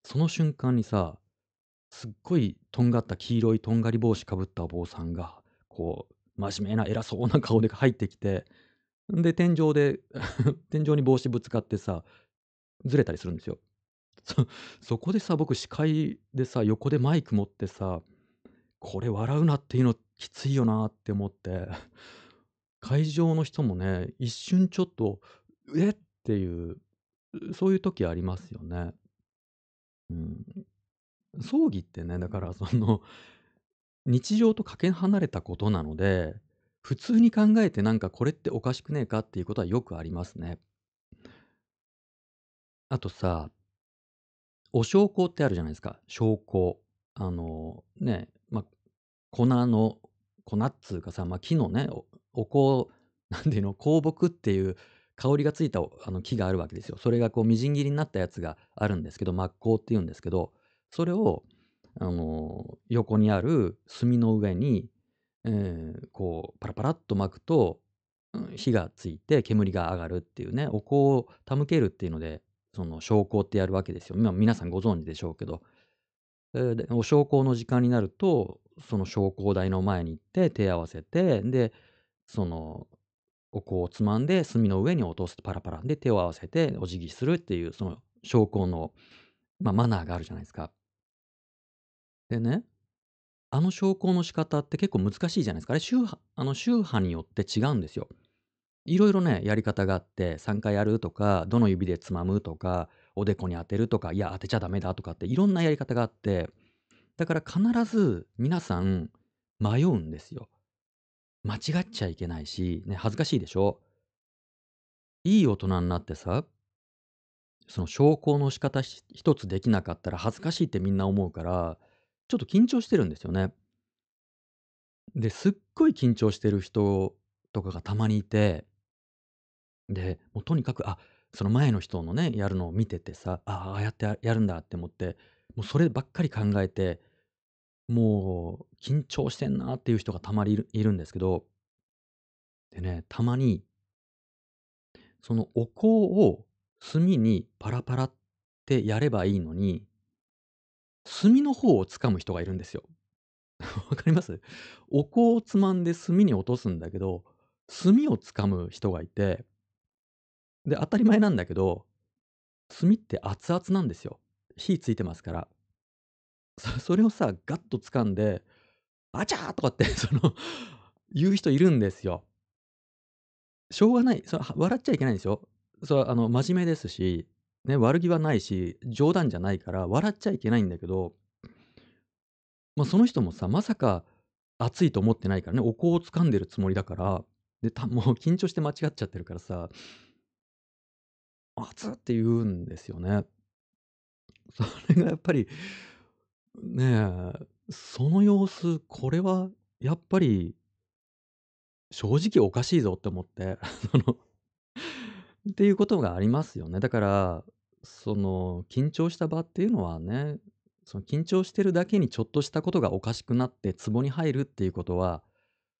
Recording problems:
high frequencies cut off; noticeable; nothing above 8 kHz

